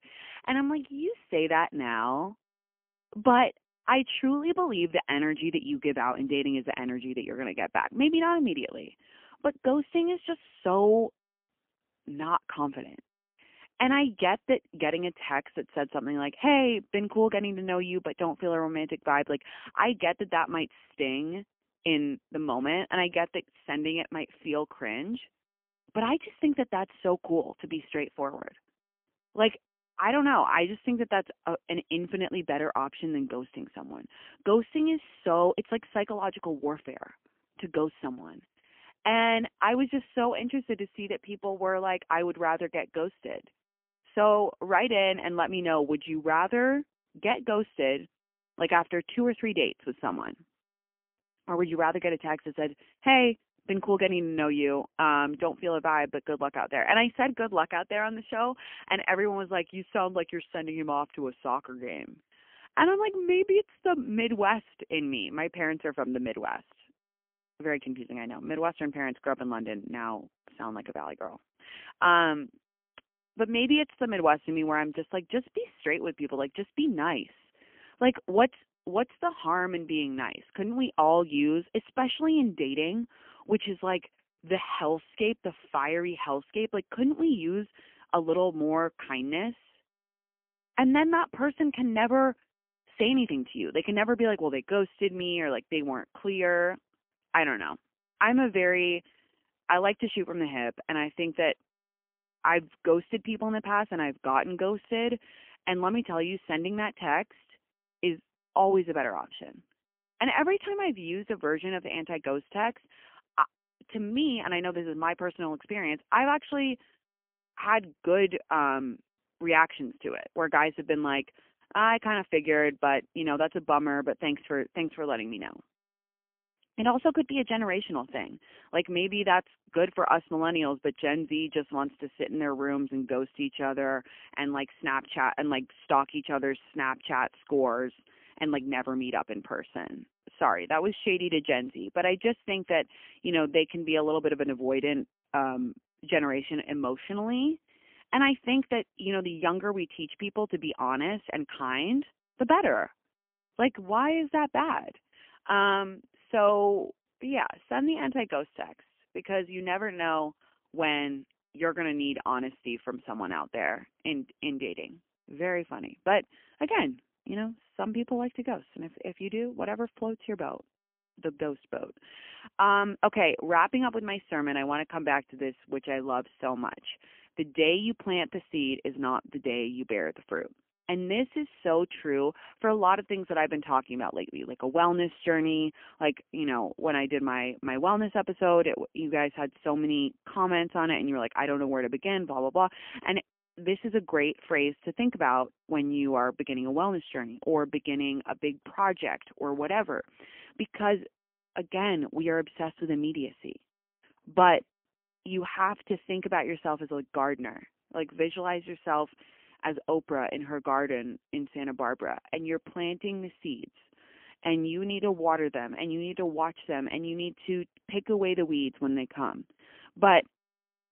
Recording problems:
phone-call audio; poor line; nothing above 3 kHz

